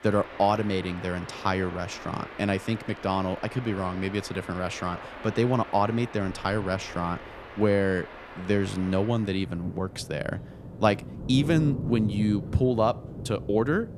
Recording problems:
rain or running water; noticeable; throughout; 10 dB below the speech

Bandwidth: 14.5 kHz